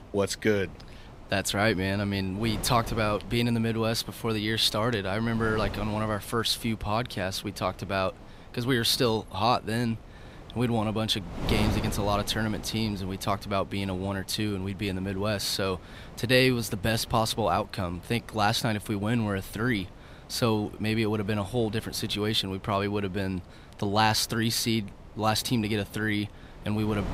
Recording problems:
wind noise on the microphone; occasional gusts; 20 dB below the speech

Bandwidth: 15.5 kHz